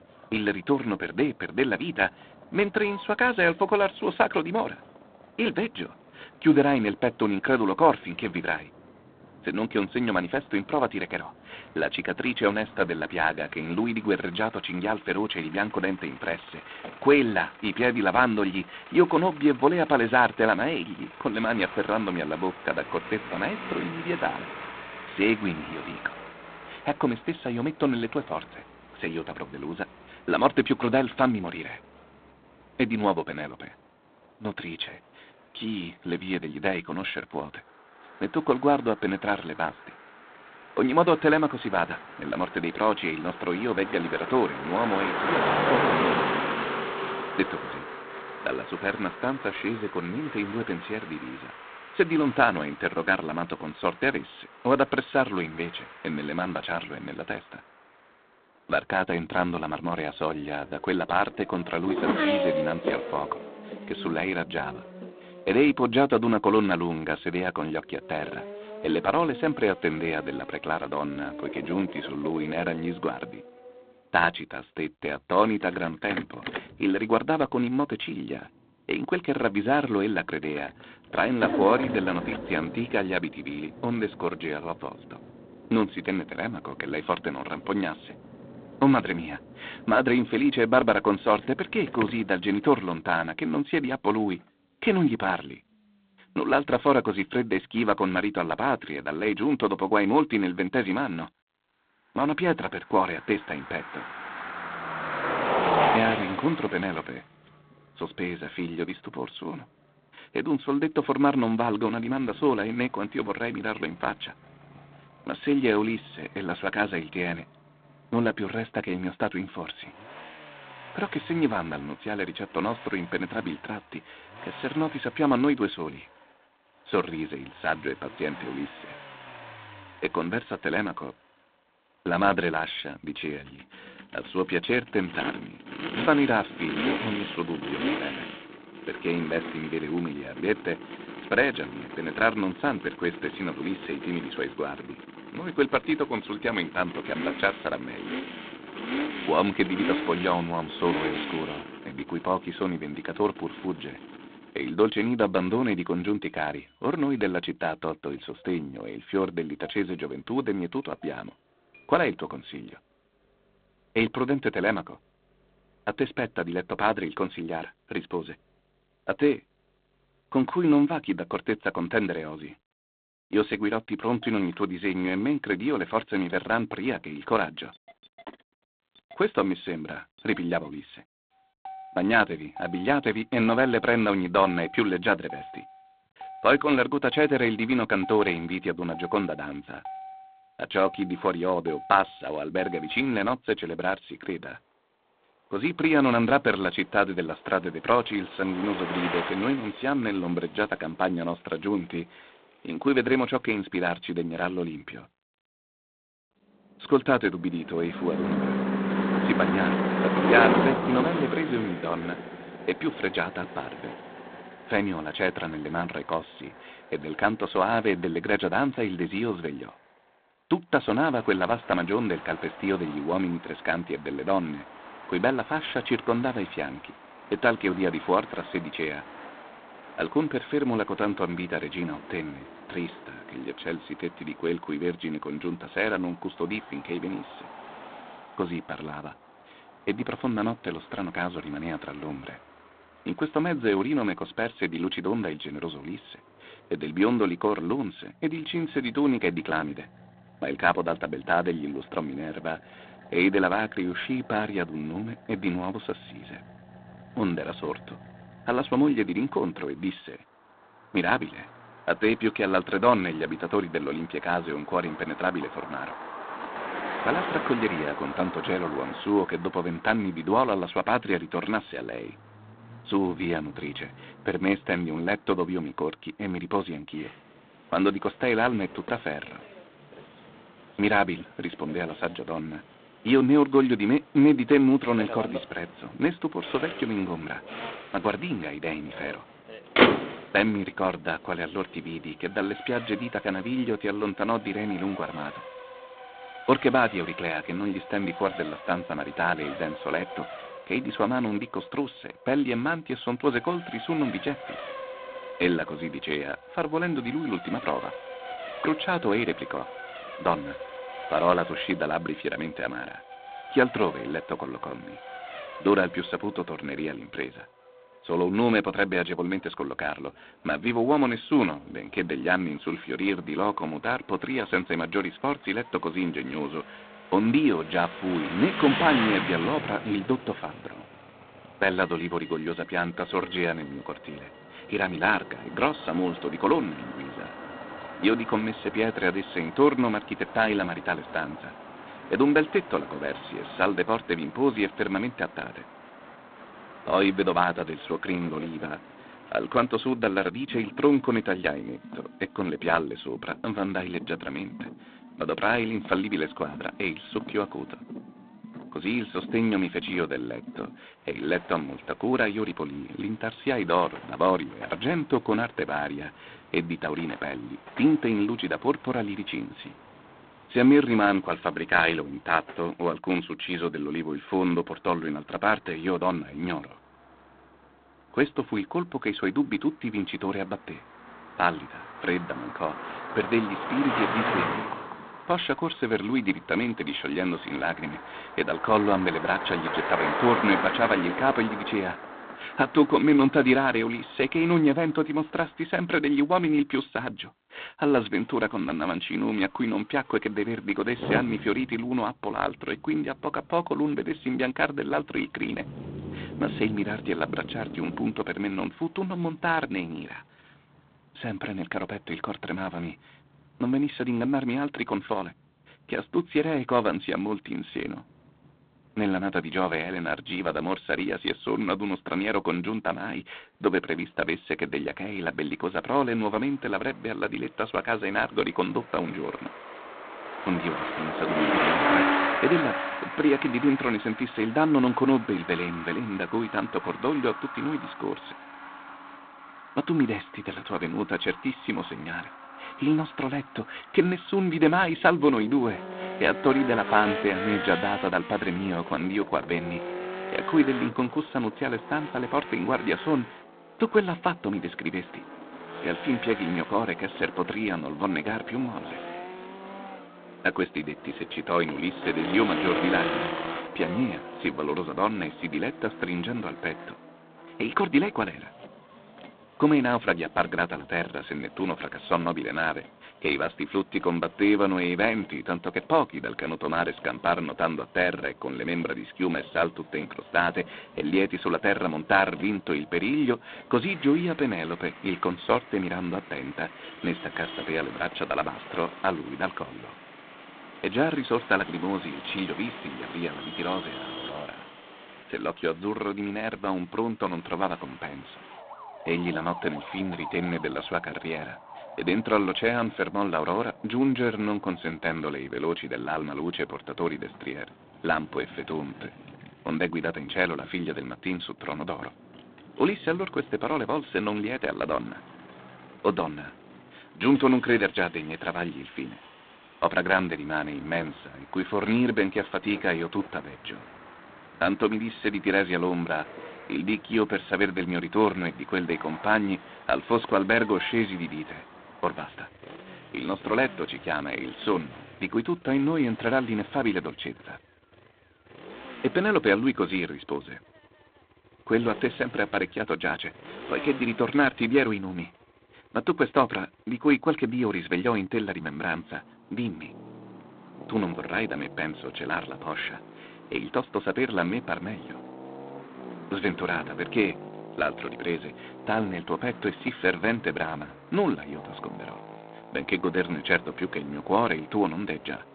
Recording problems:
phone-call audio; poor line; nothing above 4 kHz
traffic noise; loud; throughout; 9 dB below the speech

